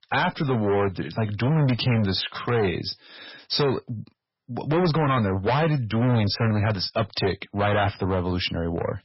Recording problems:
distortion; heavy; 15% of the sound clipped
garbled, watery; badly; nothing above 5.5 kHz

